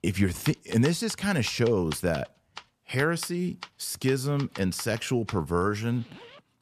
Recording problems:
household noises; noticeable; throughout; 15 dB below the speech

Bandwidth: 14.5 kHz